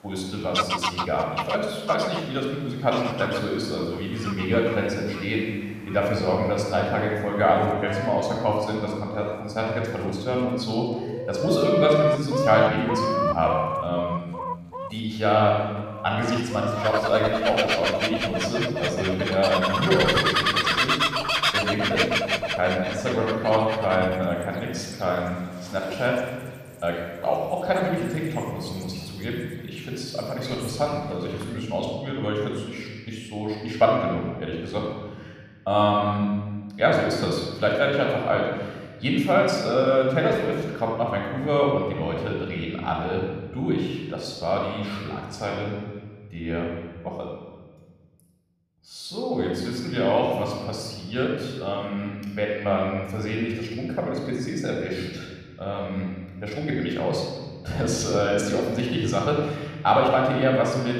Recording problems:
room echo; noticeable; dies away in 1.5 s
off-mic speech; somewhat distant
animal sounds; loud; until 32 s; 1 dB below the speech

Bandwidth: 14.5 kHz